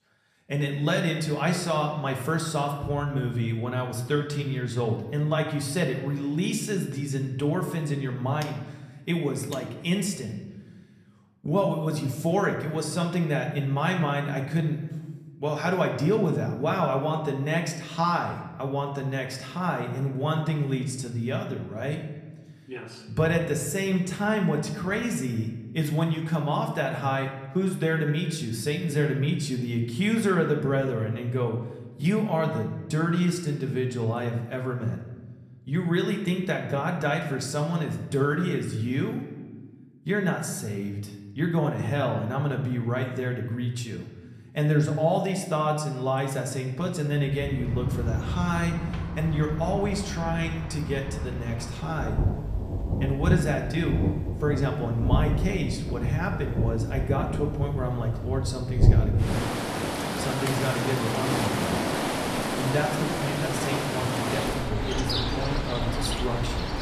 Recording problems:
room echo; slight; dies away in 0.9 s
off-mic speech; somewhat distant
rain or running water; loud; from 48 s on; 1 dB below the speech

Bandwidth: 14.5 kHz